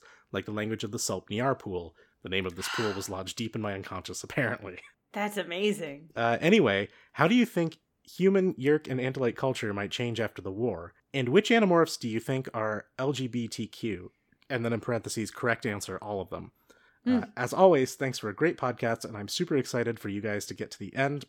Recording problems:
none

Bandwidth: 17.5 kHz